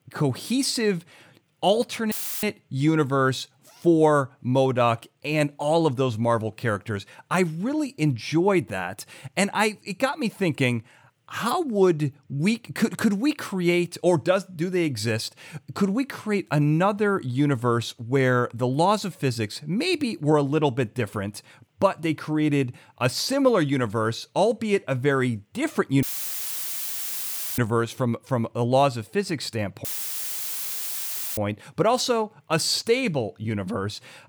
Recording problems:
audio cutting out; filled with static; at 2 s, at 26 s for 1.5 s and at 30 s for 1.5 s

